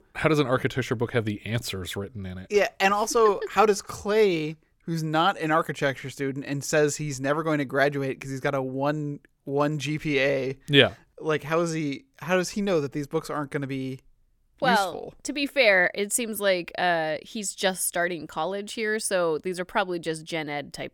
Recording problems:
none

